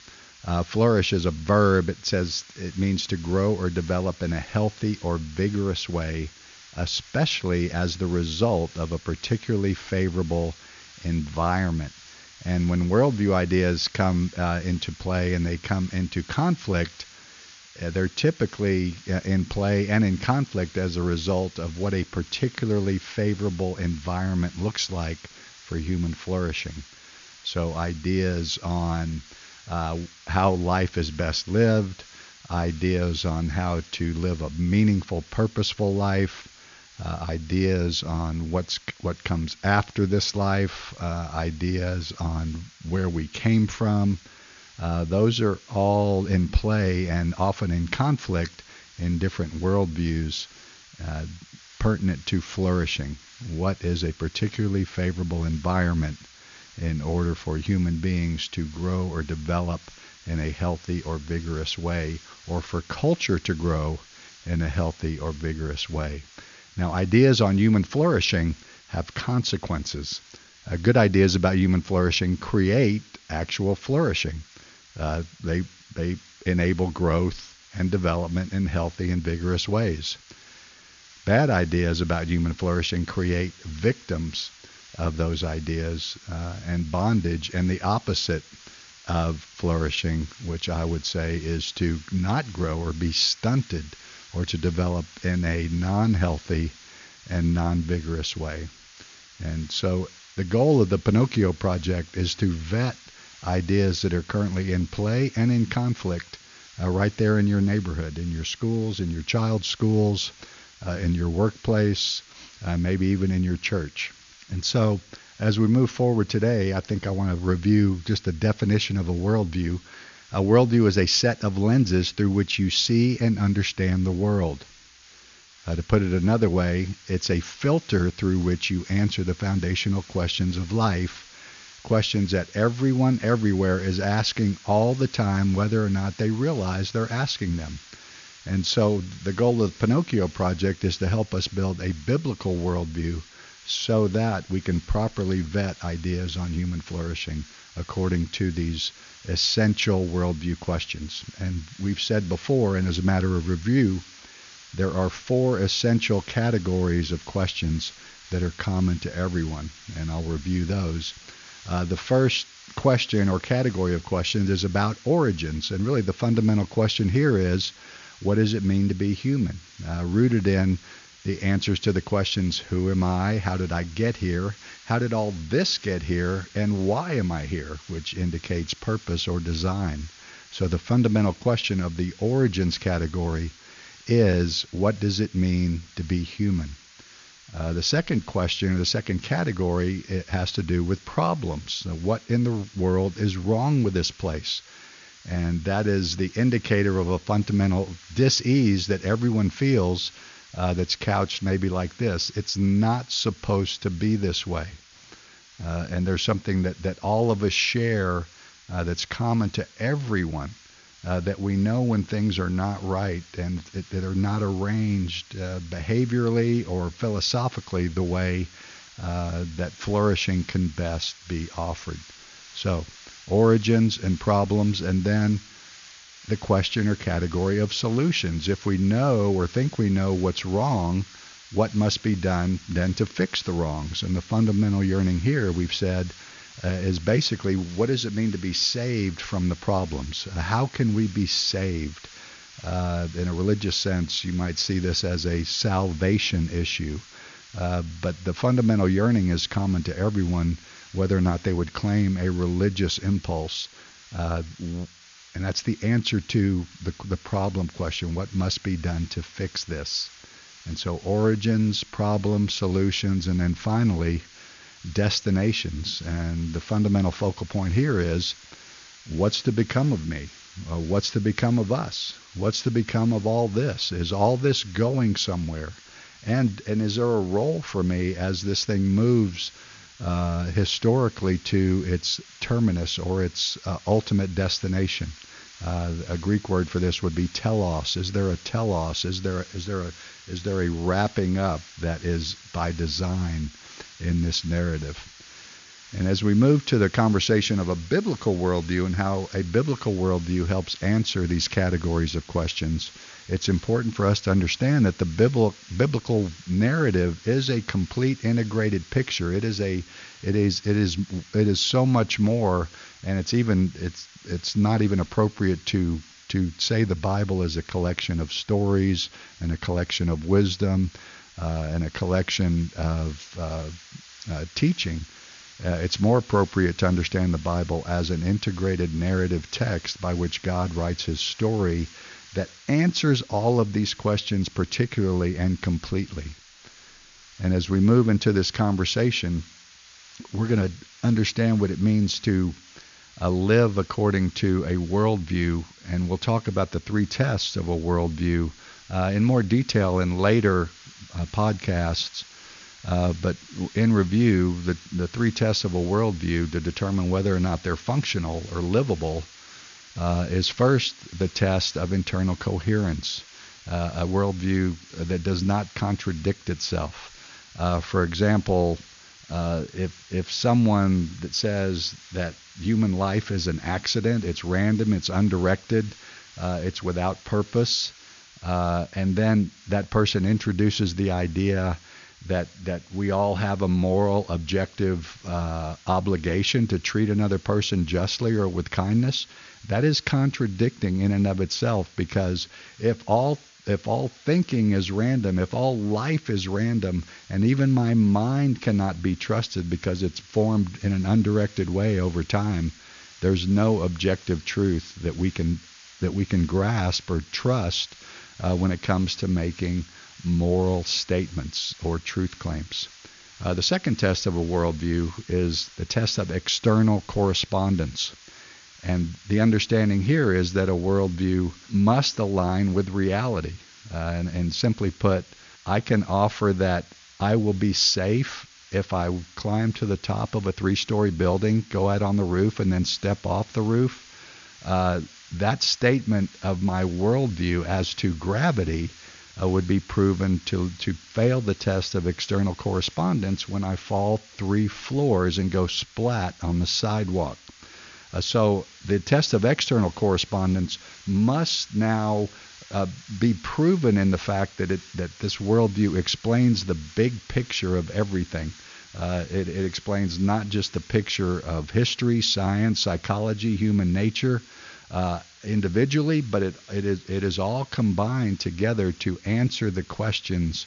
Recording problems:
high frequencies cut off; noticeable; nothing above 7 kHz
hiss; faint; throughout; 20 dB below the speech

